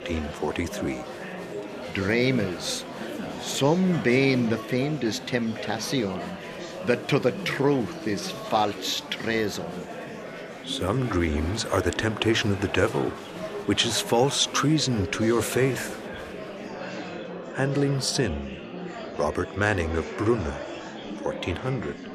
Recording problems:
murmuring crowd; loud; throughout; 10 dB below the speech

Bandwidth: 14 kHz